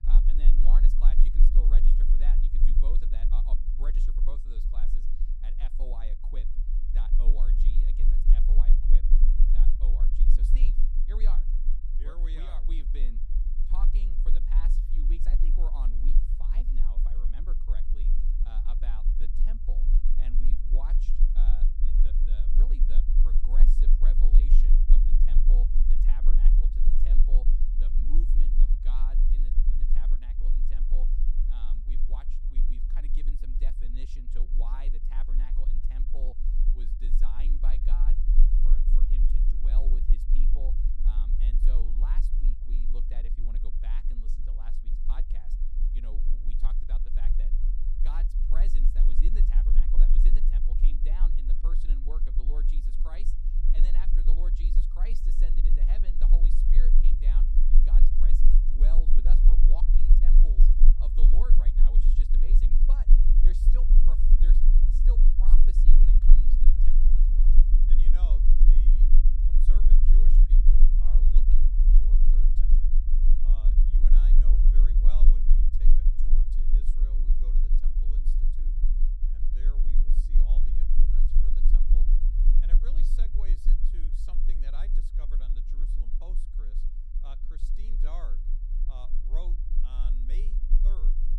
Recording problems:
low rumble; loud; throughout; 1 dB below the speech

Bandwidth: 14.5 kHz